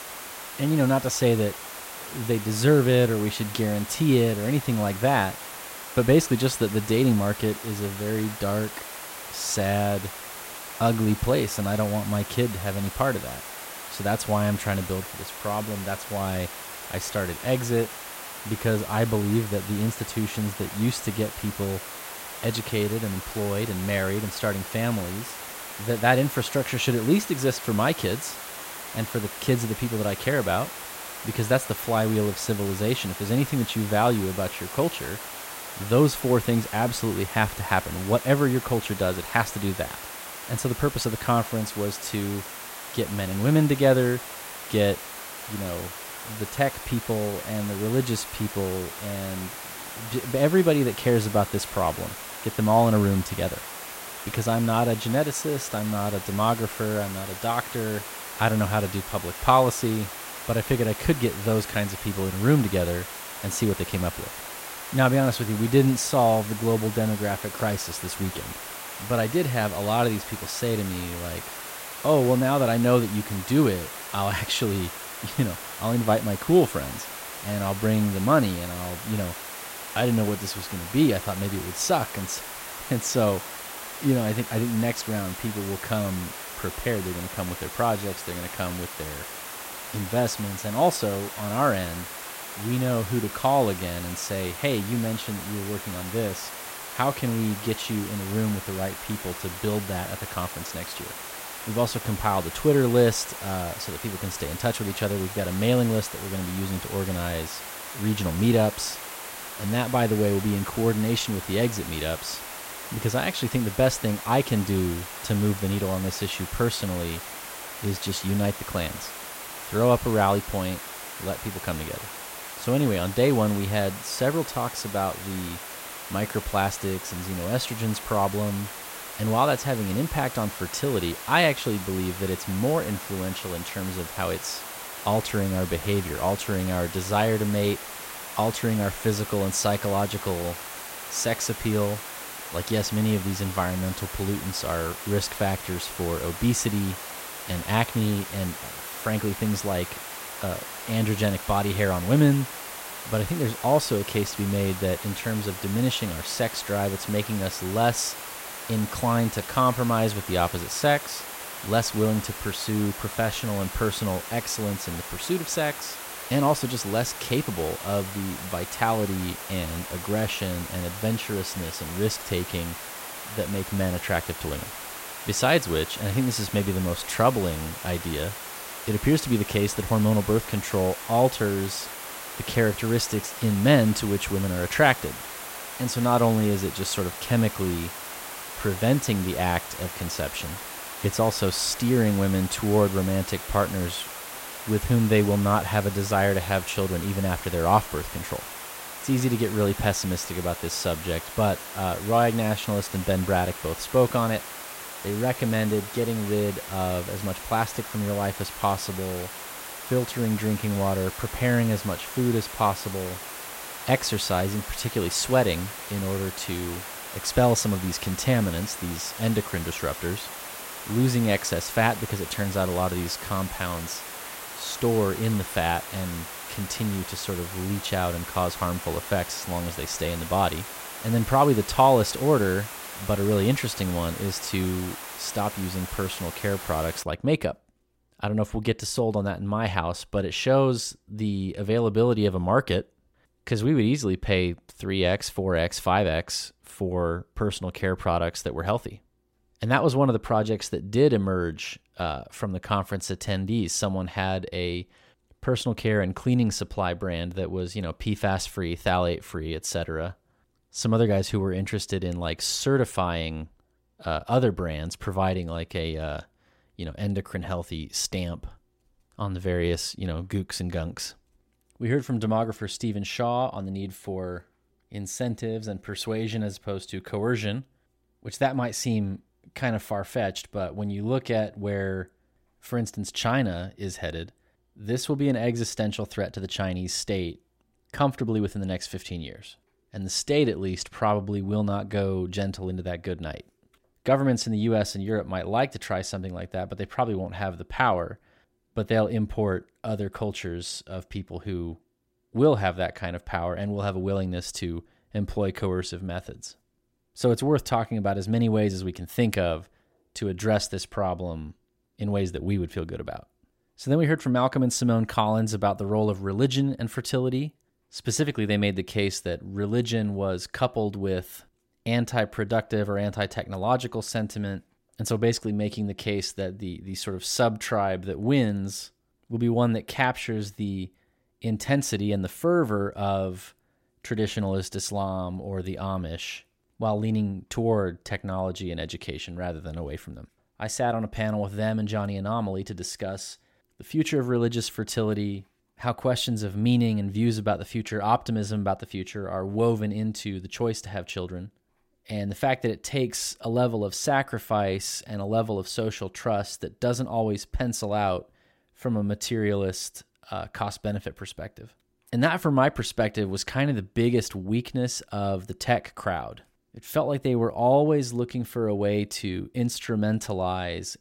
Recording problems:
hiss; loud; until 3:57; 9 dB below the speech

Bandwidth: 16 kHz